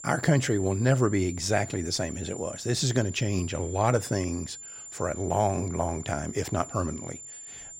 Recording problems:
high-pitched whine; noticeable; throughout; 7 kHz, 10 dB below the speech

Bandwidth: 16 kHz